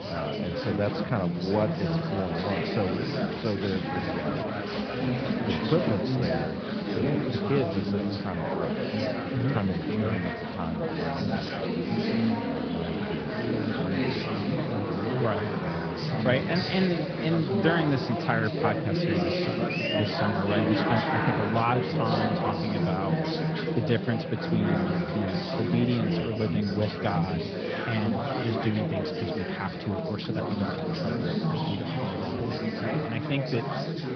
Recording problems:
garbled, watery; slightly; nothing above 5 kHz
high frequencies cut off; slight
chatter from many people; very loud; throughout; 2 dB above the speech

